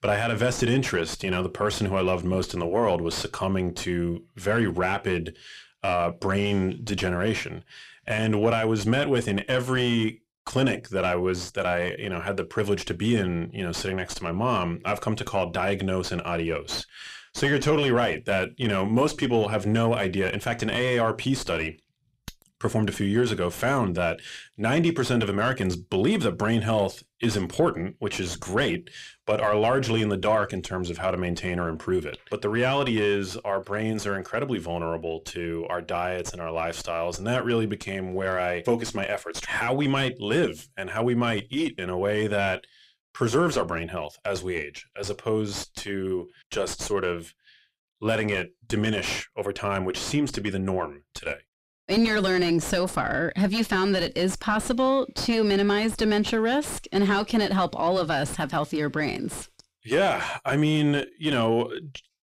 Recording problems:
distortion; slight; 9 dB below the speech

